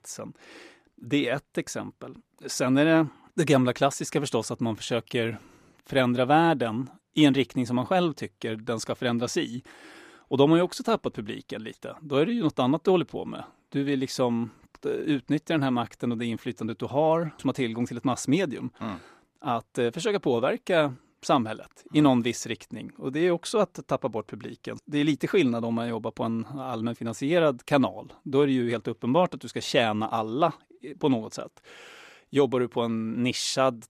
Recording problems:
none

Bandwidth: 14.5 kHz